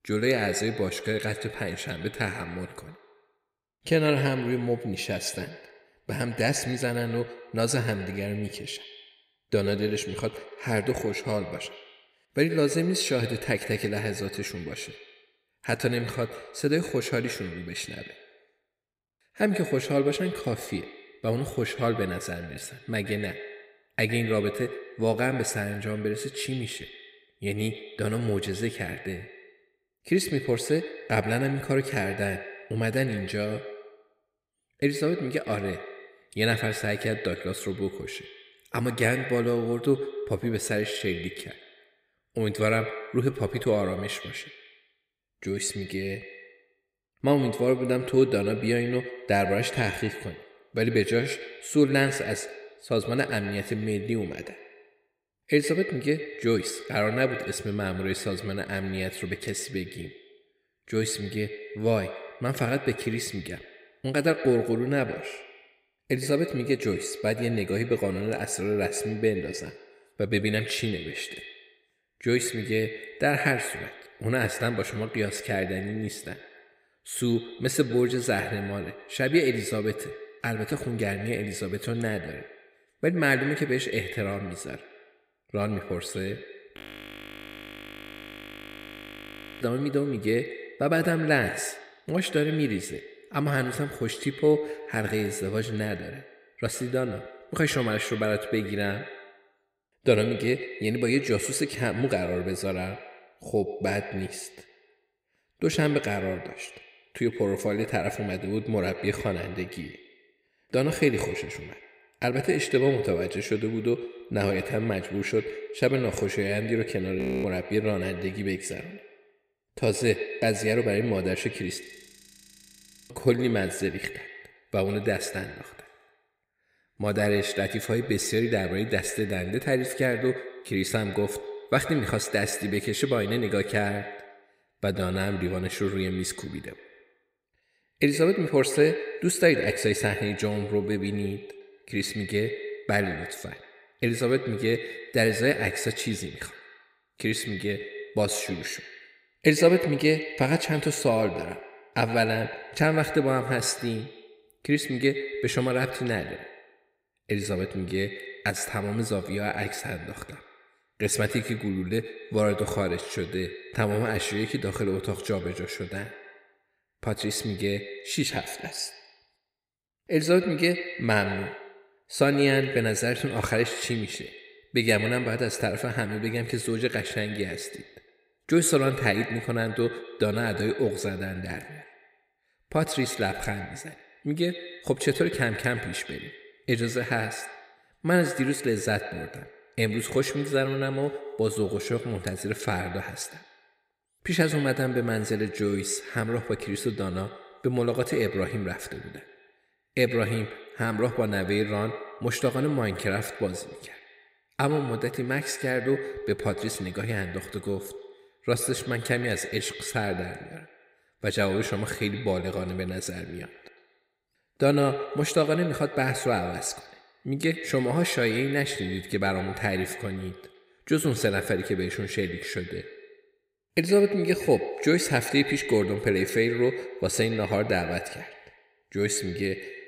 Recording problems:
echo of what is said; strong; throughout; 110 ms later, 10 dB below the speech
audio freezing; at 1:27 for 3 s, at 1:57 and at 2:02 for 1.5 s

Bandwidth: 15.5 kHz